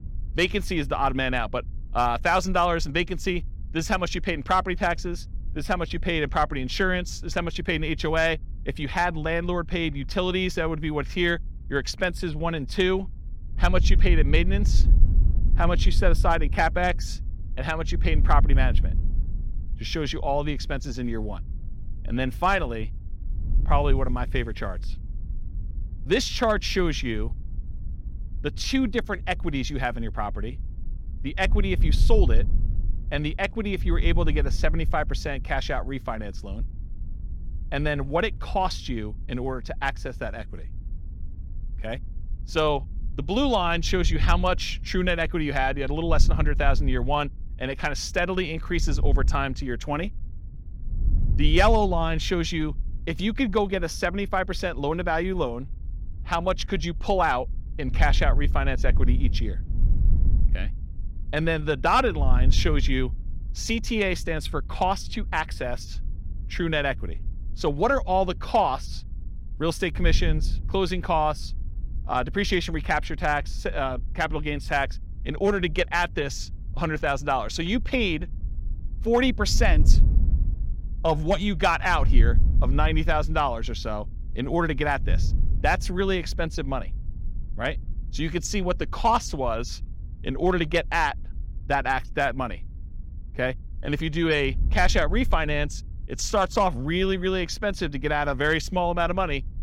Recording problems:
wind noise on the microphone; occasional gusts; 25 dB below the speech

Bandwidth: 16.5 kHz